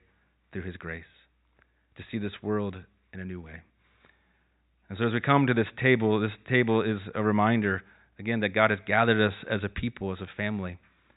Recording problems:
high frequencies cut off; severe; nothing above 4 kHz

